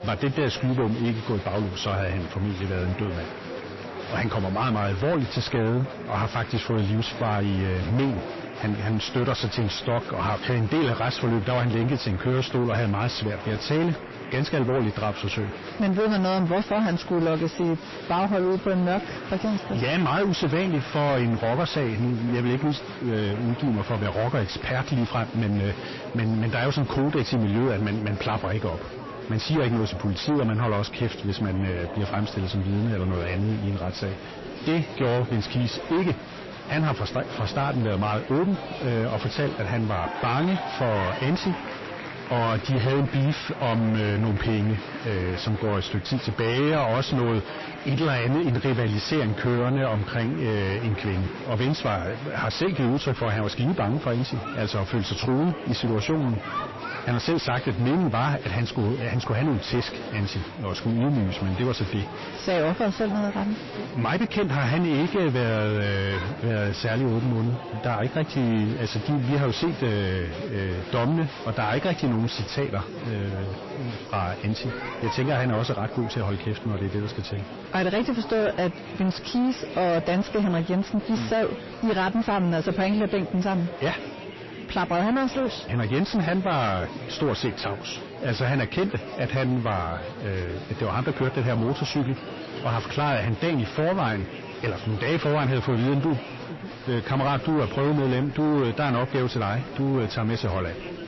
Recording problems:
distortion; heavy; 6 dB below the speech
garbled, watery; slightly; nothing above 5.5 kHz
murmuring crowd; noticeable; throughout; 10 dB below the speech

